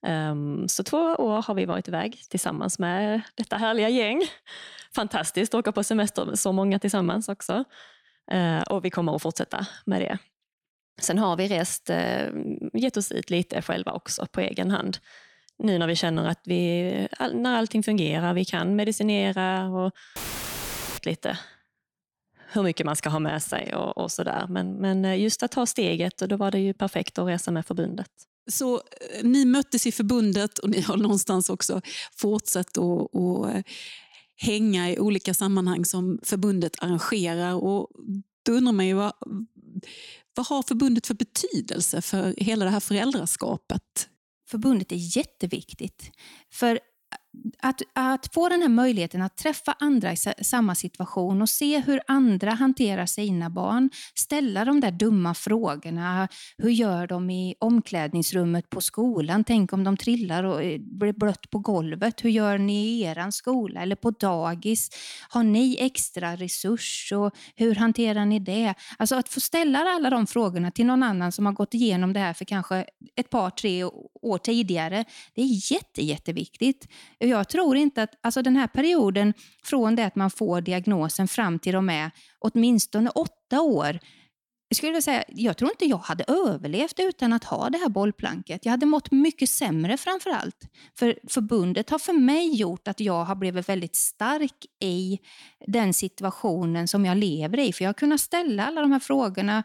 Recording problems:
audio cutting out; filled with static; at 20 s for 1 s

